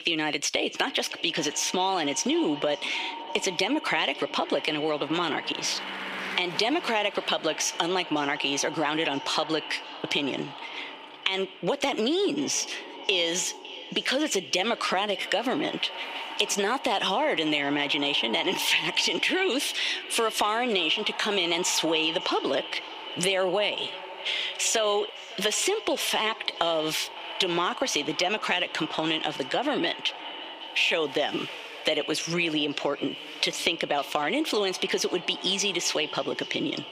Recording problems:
echo of what is said; strong; throughout; 560 ms later, 10 dB below the speech
squashed, flat; heavily, background pumping
thin; very slightly; fading below 400 Hz
traffic noise; noticeable; throughout; 20 dB below the speech

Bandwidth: 15 kHz